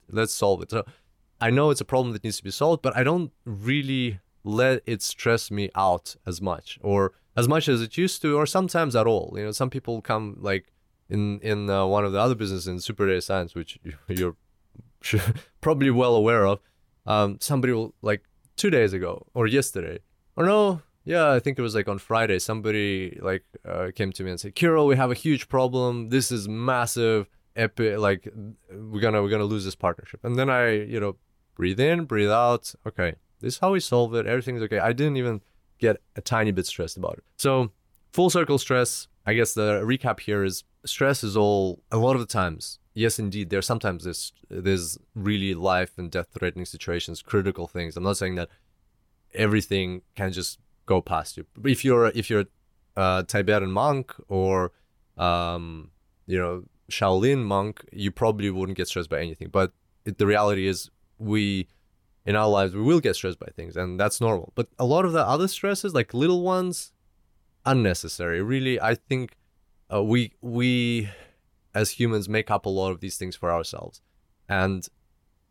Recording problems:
none

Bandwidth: 17.5 kHz